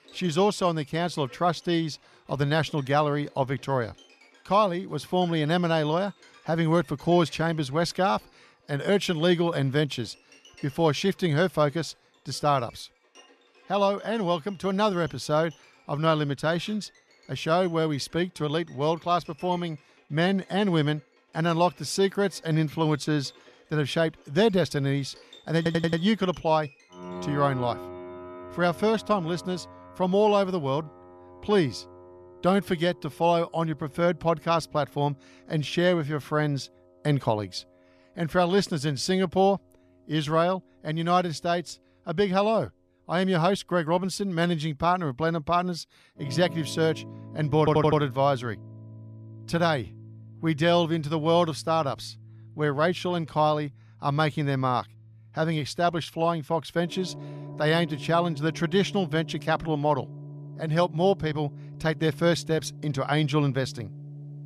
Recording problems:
background music; noticeable; throughout; 20 dB below the speech
audio stuttering; at 26 s and at 48 s

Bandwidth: 14 kHz